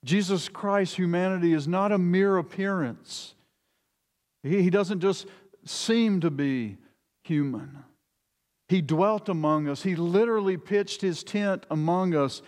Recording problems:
none

